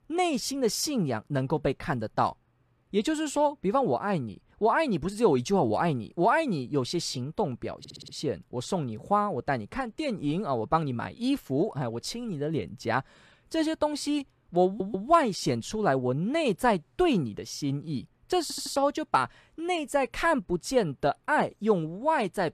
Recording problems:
audio stuttering; at 8 s, at 15 s and at 18 s

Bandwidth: 14 kHz